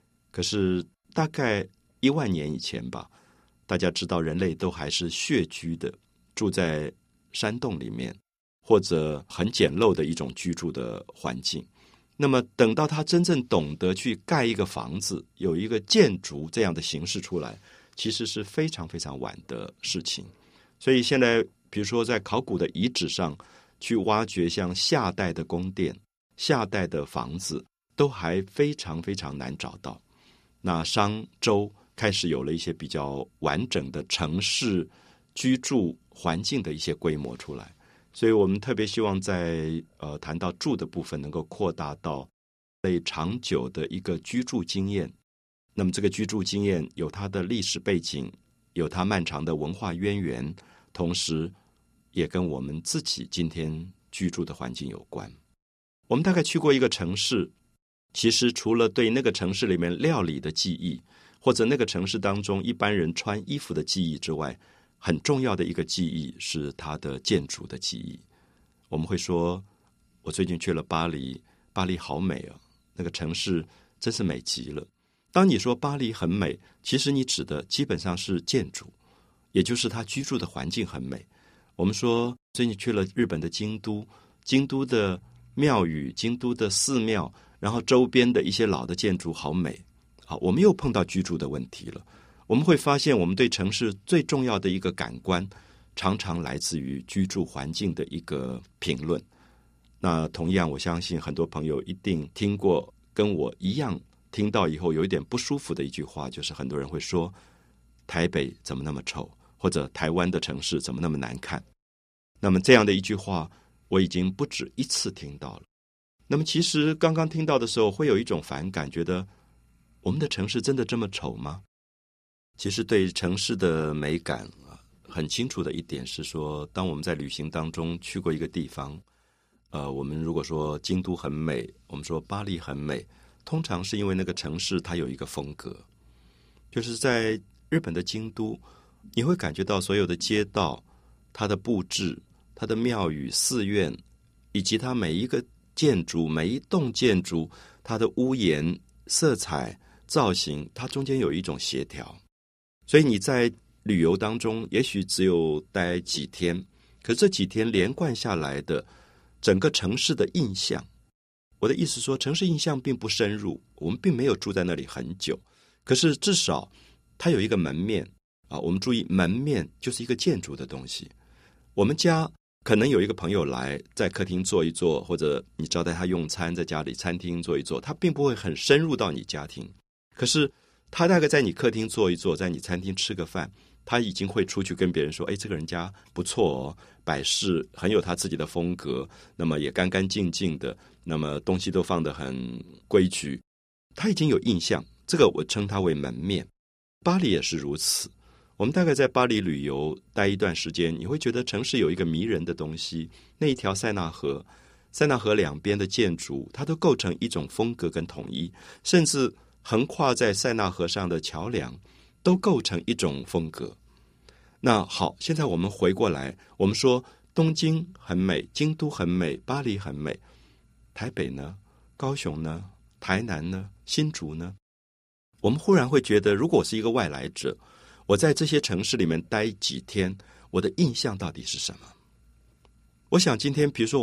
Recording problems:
abrupt cut into speech; at the end

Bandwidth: 15 kHz